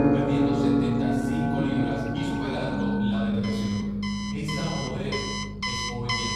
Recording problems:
off-mic speech; far
room echo; noticeable; dies away in 1.2 s
background music; very loud; throughout; 6 dB above the speech
alarms or sirens; loud; throughout; 2 dB below the speech
electrical hum; noticeable; throughout; 50 Hz, 15 dB below the speech
uneven, jittery; strongly; from 1 to 6 s

